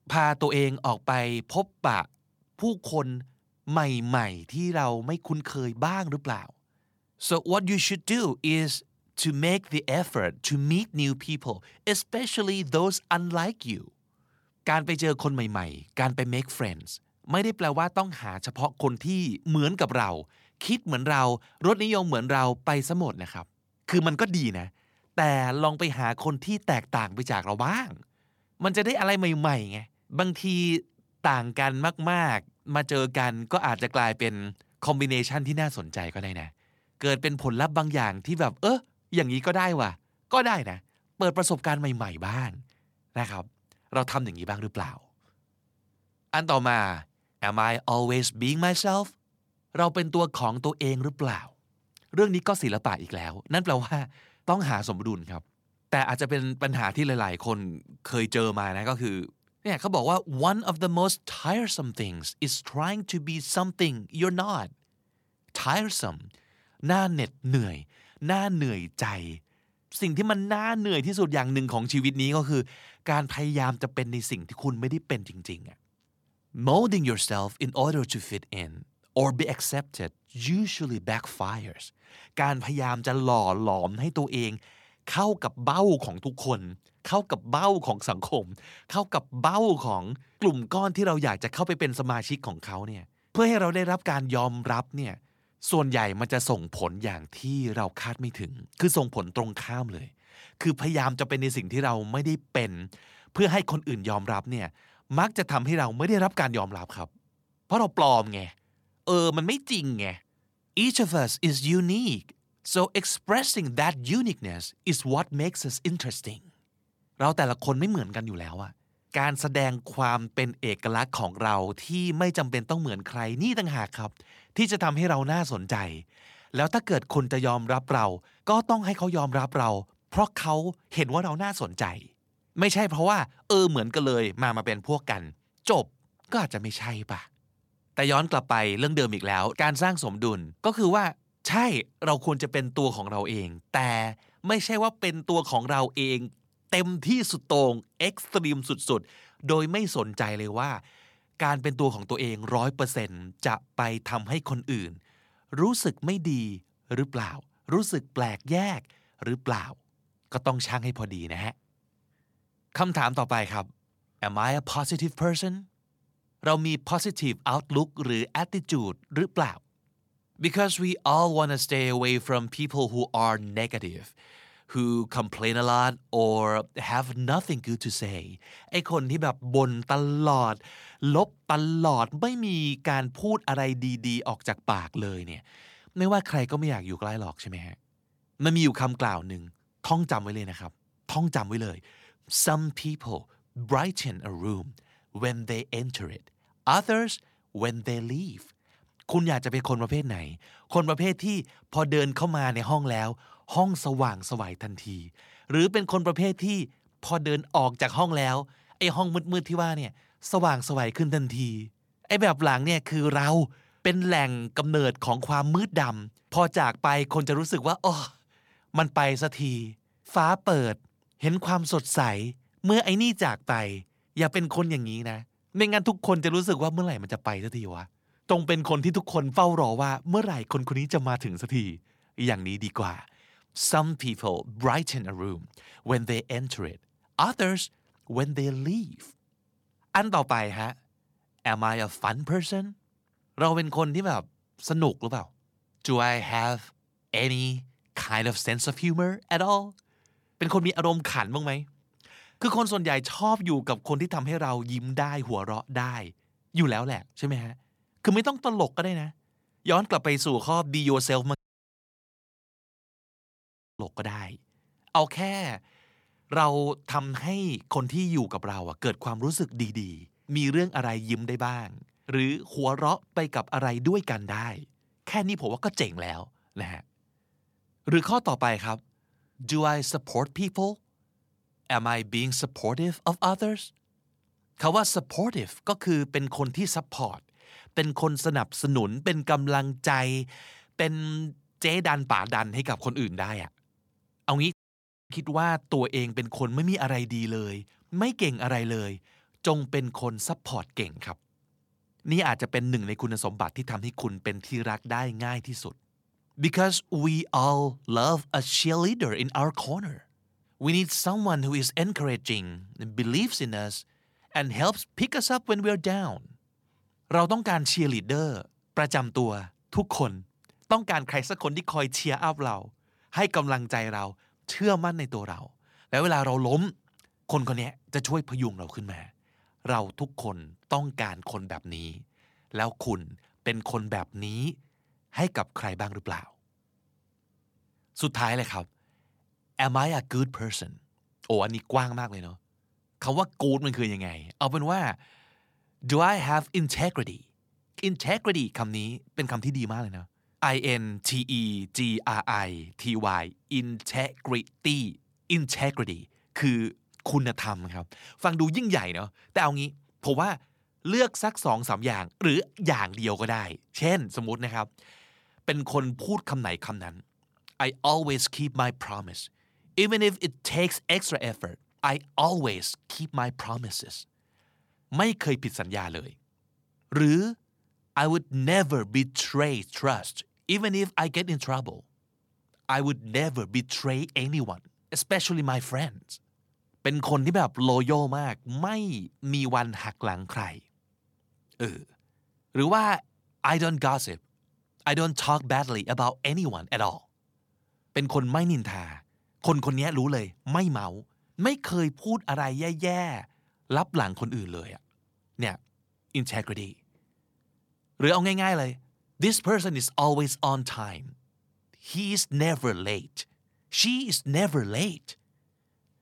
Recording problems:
audio cutting out; at 4:21 for 2.5 s and at 4:55 for 0.5 s

